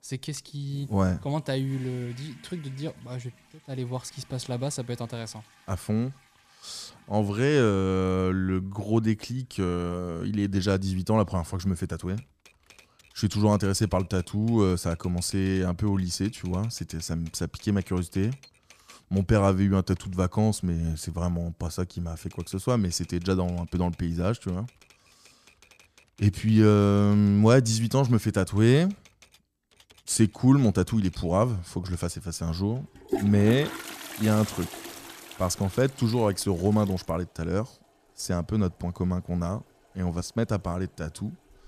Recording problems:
household noises; noticeable; throughout; 20 dB below the speech

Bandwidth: 14.5 kHz